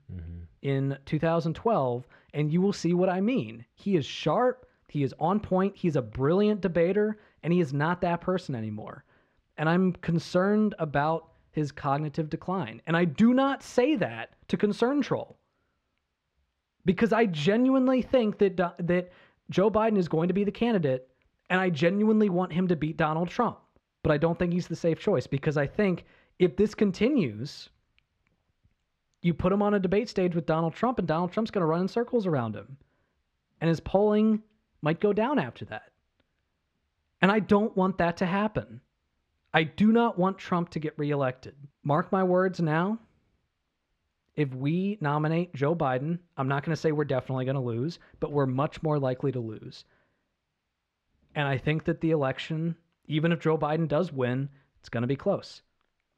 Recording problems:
muffled; slightly; fading above 3 kHz

